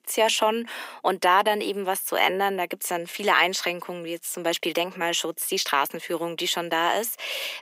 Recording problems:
thin; very; fading below 300 Hz

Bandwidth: 15.5 kHz